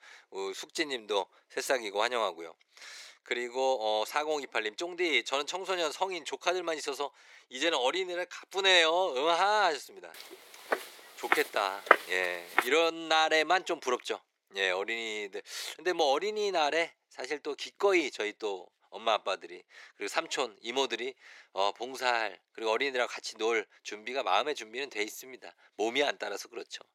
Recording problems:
thin; very; fading below 400 Hz
footsteps; loud; from 11 to 13 s; peak 5 dB above the speech

